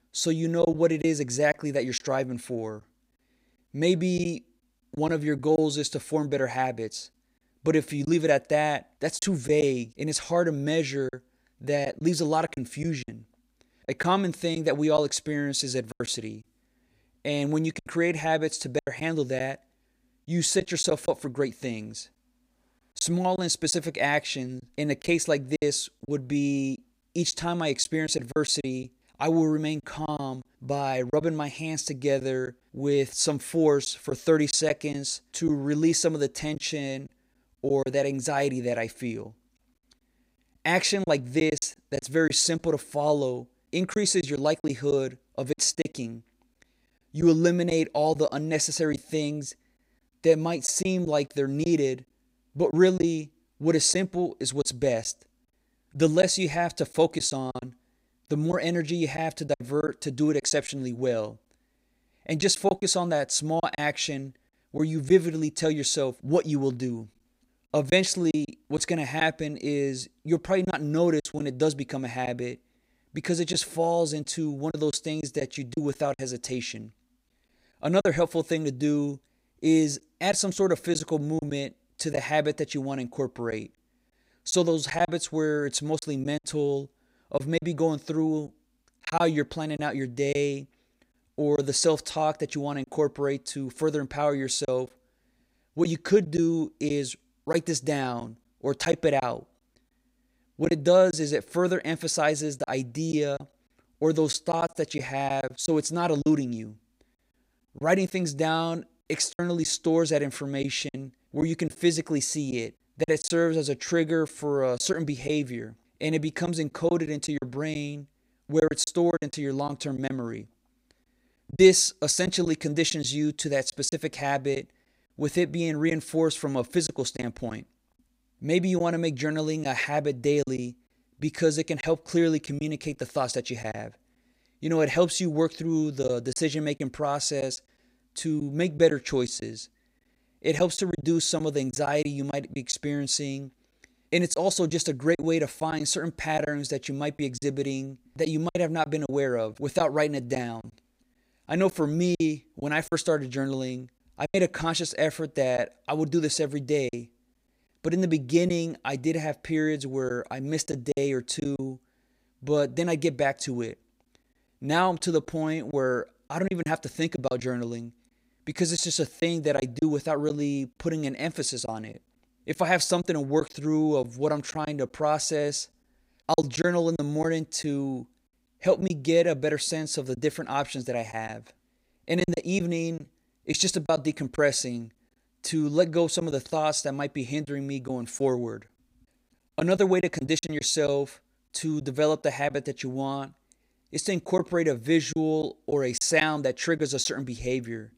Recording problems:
choppy; occasionally; 5% of the speech affected

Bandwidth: 15.5 kHz